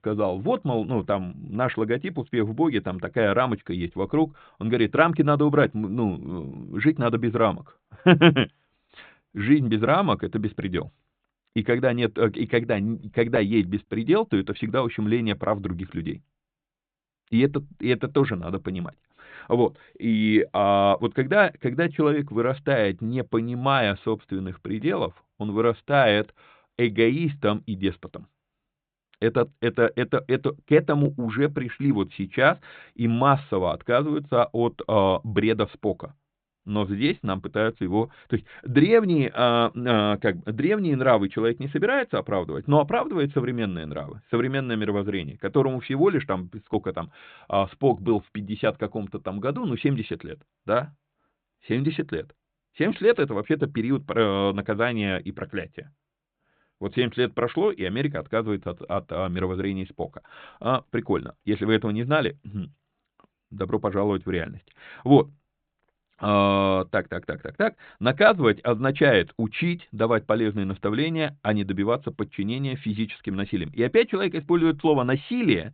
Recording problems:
high frequencies cut off; severe; nothing above 4 kHz

